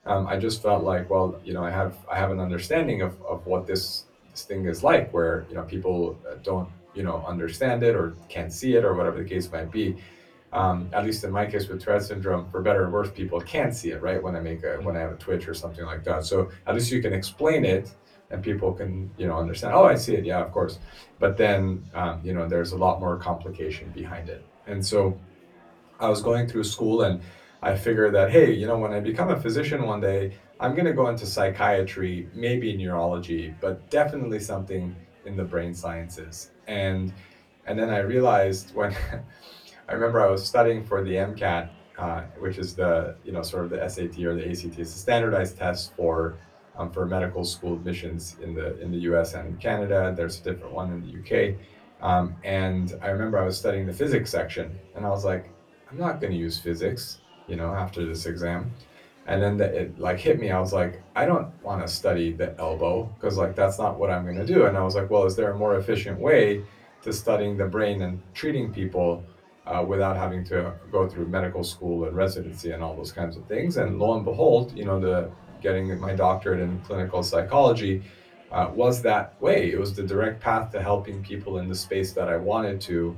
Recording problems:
off-mic speech; far
room echo; very slight; dies away in 0.2 s
murmuring crowd; faint; throughout; 30 dB below the speech

